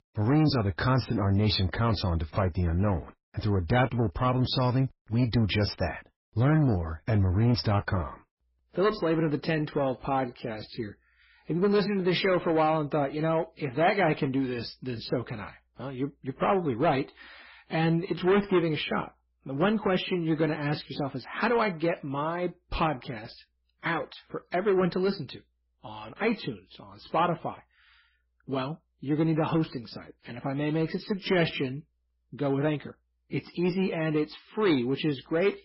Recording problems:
garbled, watery; badly; nothing above 5.5 kHz
distortion; slight; 10 dB below the speech

